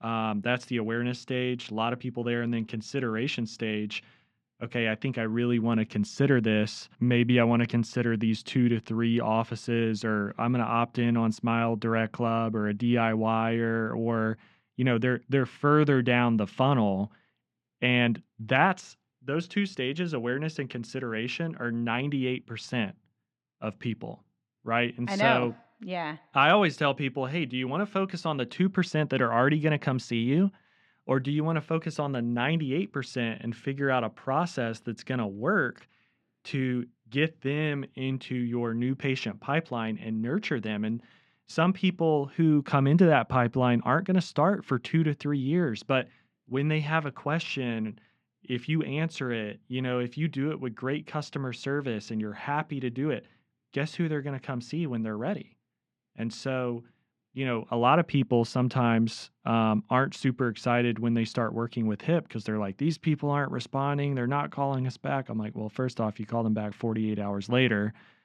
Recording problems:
muffled; slightly; fading above 3 kHz

